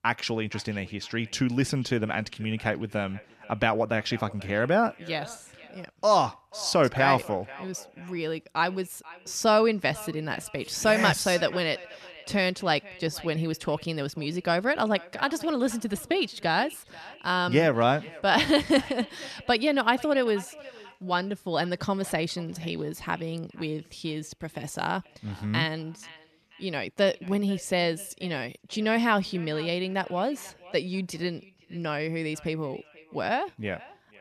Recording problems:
echo of what is said; faint; throughout; 490 ms later, 20 dB below the speech

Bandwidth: 13.5 kHz